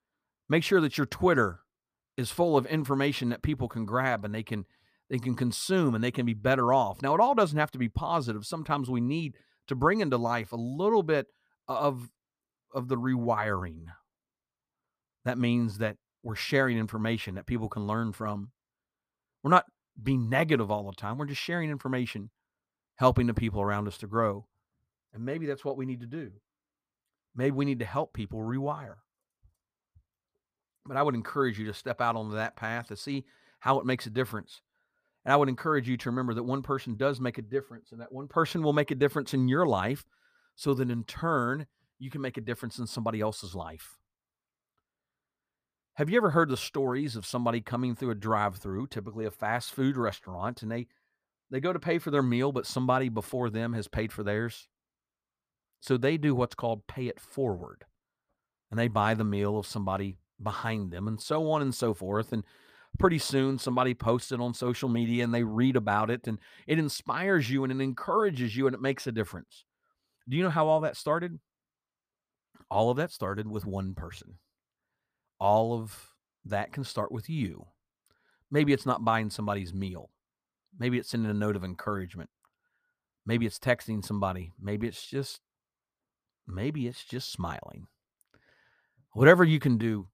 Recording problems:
none

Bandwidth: 15 kHz